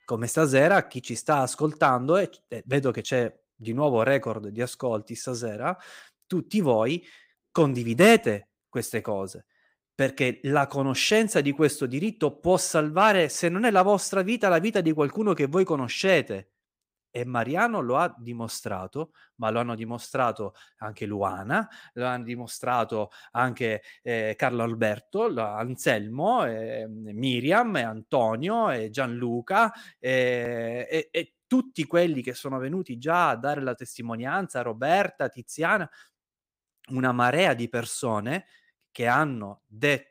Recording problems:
none

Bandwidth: 15.5 kHz